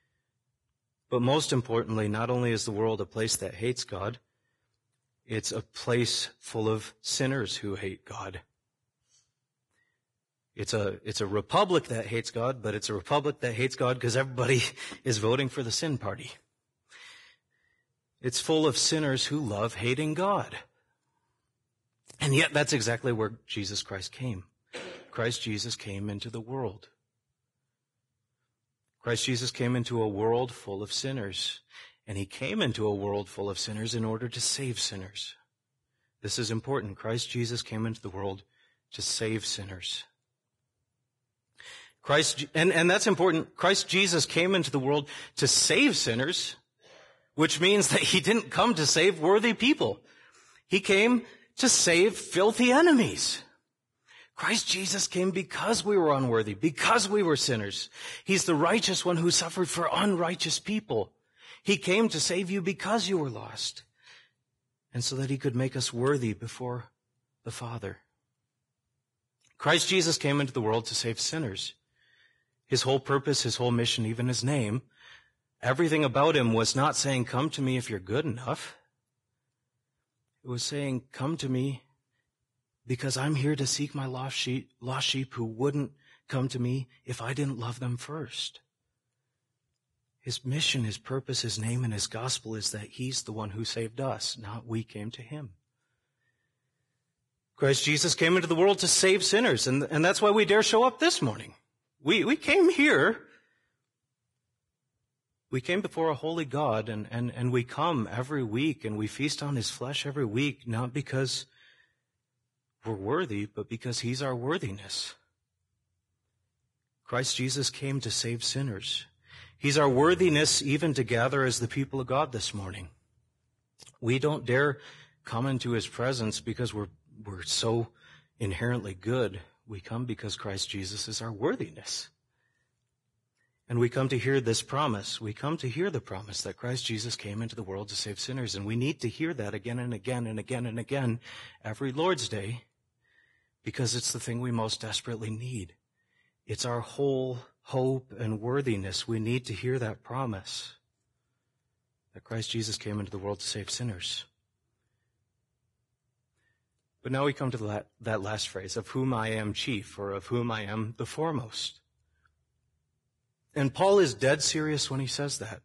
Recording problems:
garbled, watery; badly; nothing above 10.5 kHz

